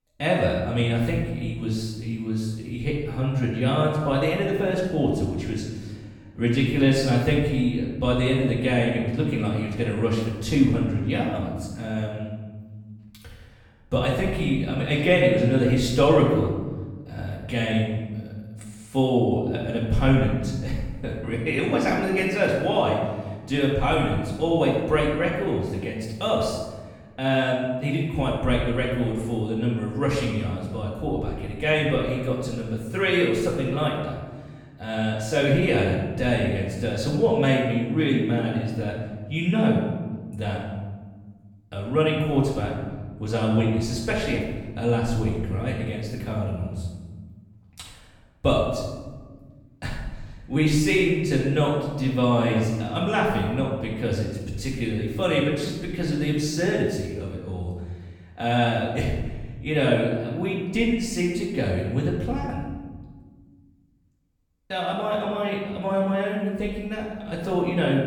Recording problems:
off-mic speech; far
room echo; noticeable; dies away in 1.2 s

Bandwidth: 17.5 kHz